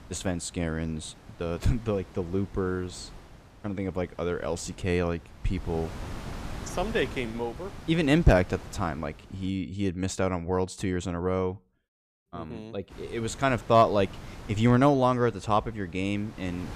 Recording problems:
wind noise on the microphone; occasional gusts; until 9.5 s and from 13 s on; 20 dB below the speech

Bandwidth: 14.5 kHz